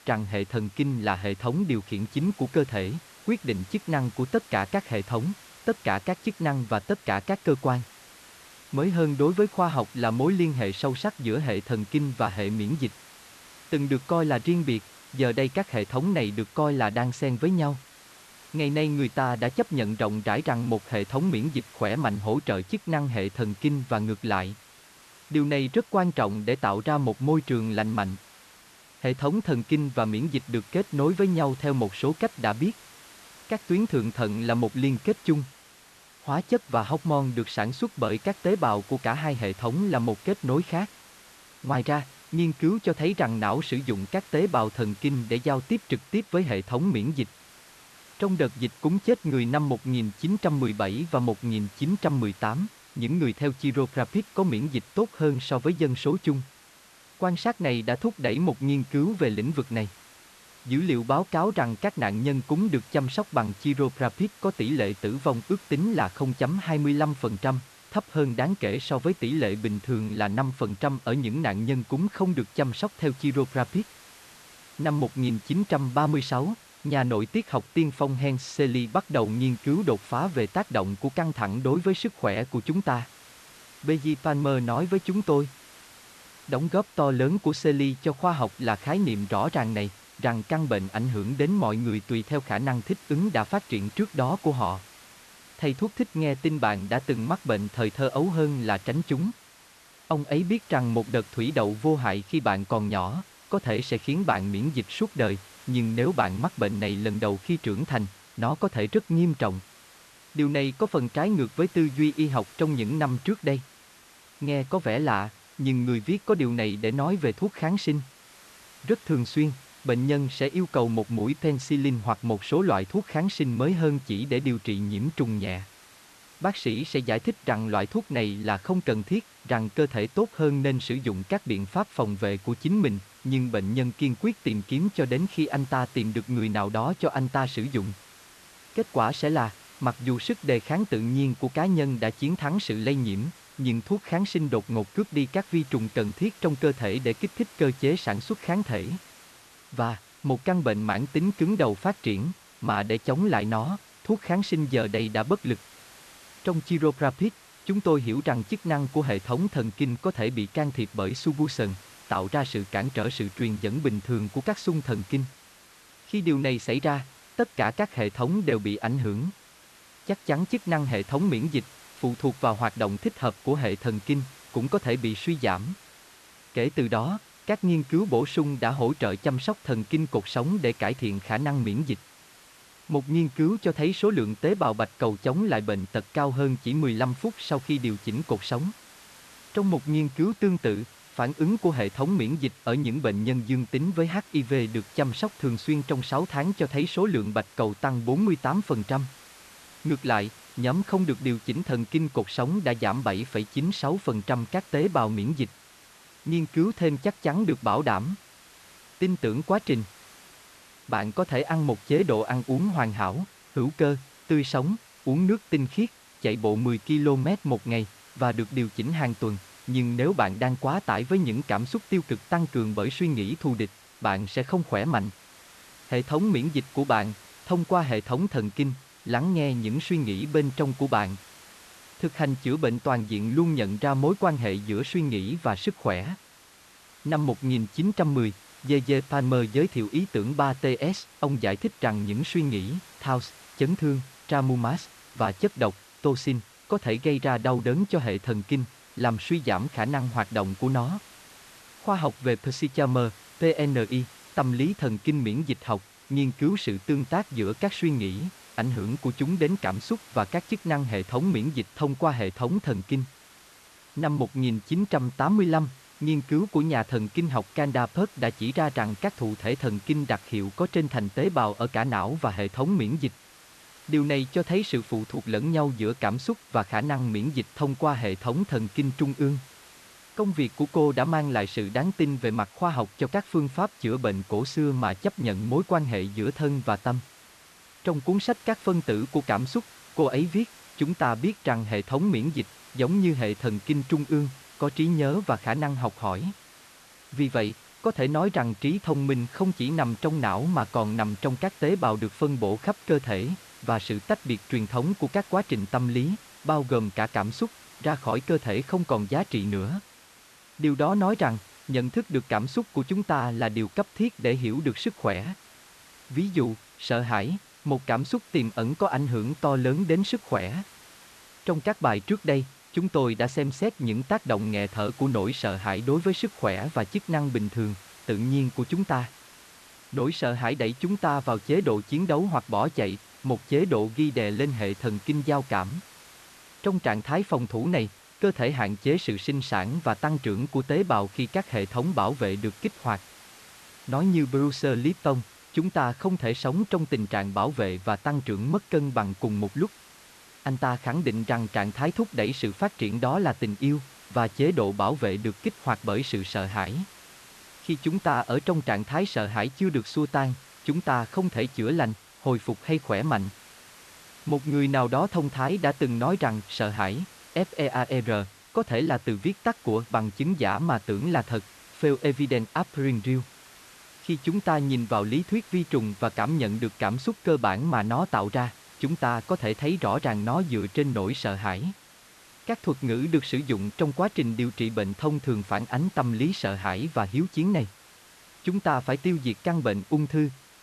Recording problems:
hiss; faint; throughout; 20 dB below the speech

